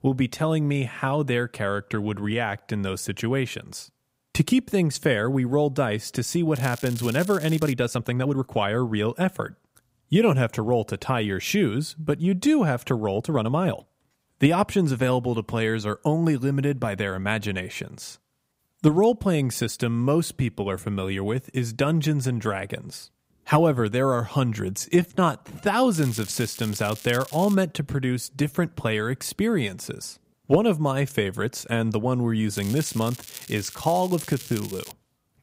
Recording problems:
crackling; noticeable; from 6.5 to 7.5 s, from 26 to 28 s and from 33 to 35 s; 15 dB below the speech
uneven, jittery; strongly; from 7.5 to 26 s

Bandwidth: 15.5 kHz